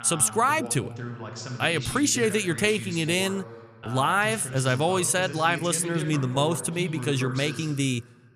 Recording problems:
voice in the background; noticeable; throughout; 10 dB below the speech

